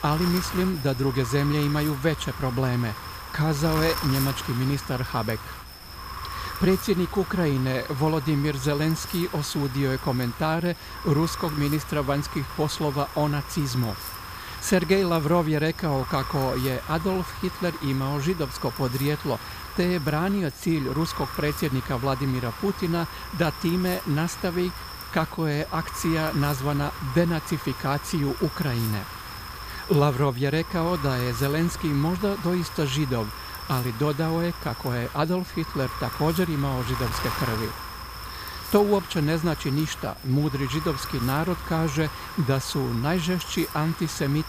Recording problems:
wind noise on the microphone; heavy; 6 dB below the speech

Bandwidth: 15 kHz